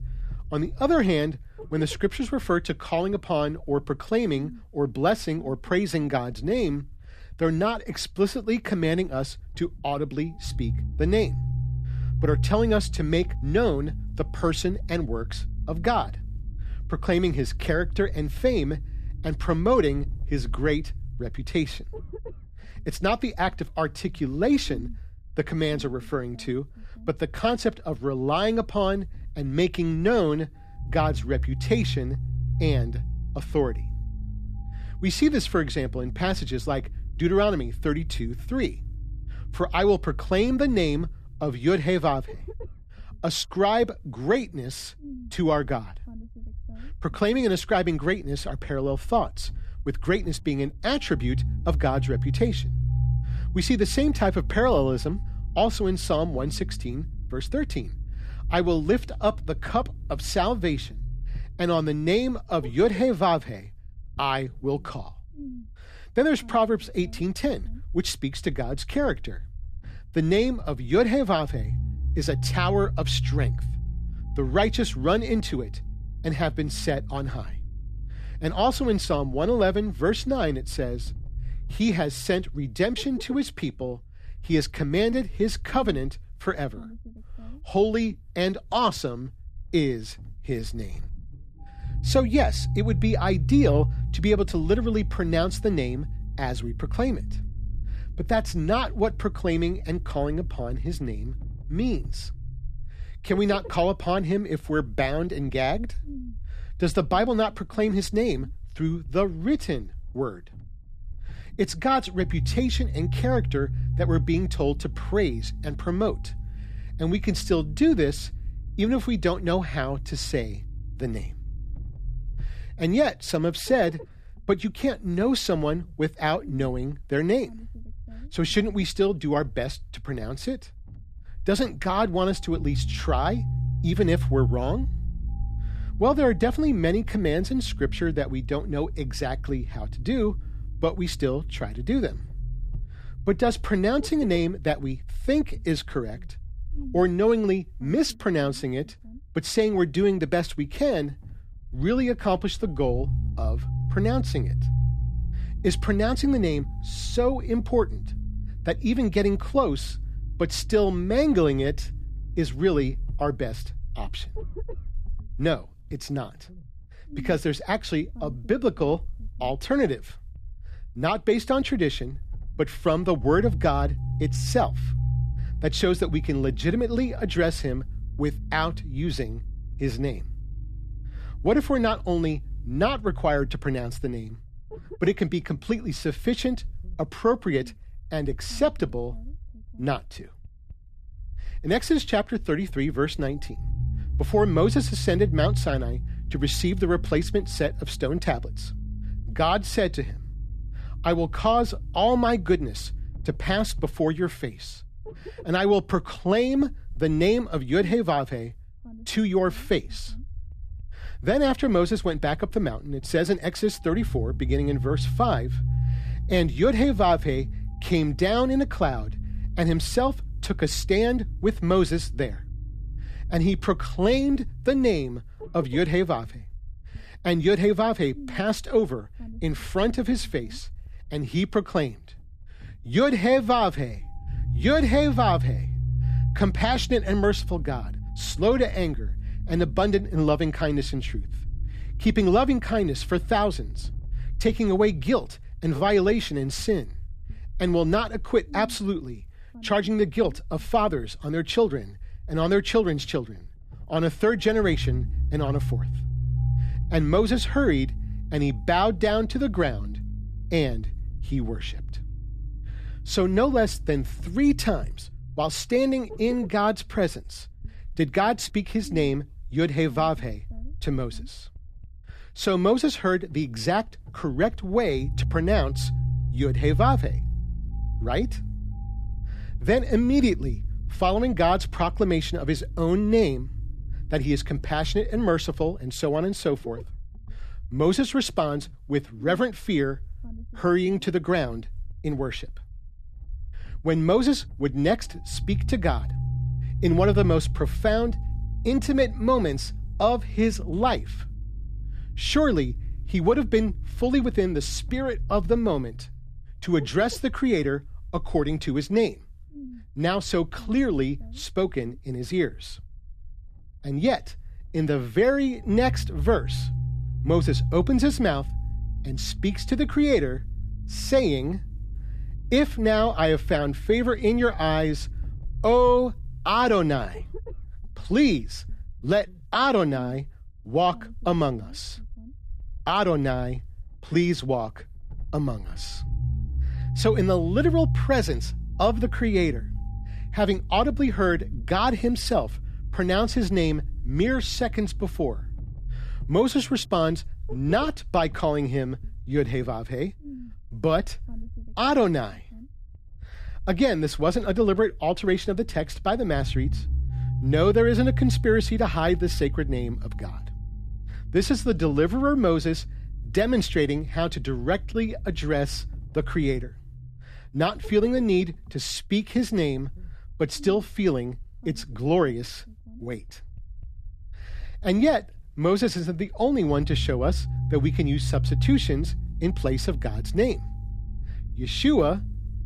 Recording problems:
low rumble; faint; throughout; 20 dB below the speech

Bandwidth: 14.5 kHz